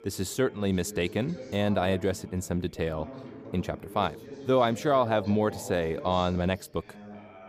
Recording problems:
background chatter; noticeable; throughout; 2 voices, 15 dB below the speech

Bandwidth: 15 kHz